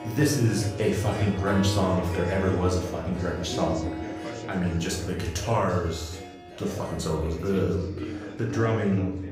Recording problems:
off-mic speech; far
room echo; noticeable; dies away in 0.6 s
background music; noticeable; throughout; 10 dB below the speech
chatter from many people; noticeable; throughout; 15 dB below the speech

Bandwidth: 15.5 kHz